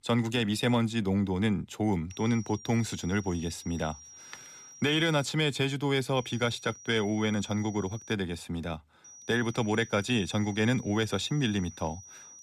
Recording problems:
high-pitched whine; noticeable; from 2 to 5.5 s, from 6 to 8 s and from 9 s on; 5.5 kHz, 20 dB below the speech

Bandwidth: 14.5 kHz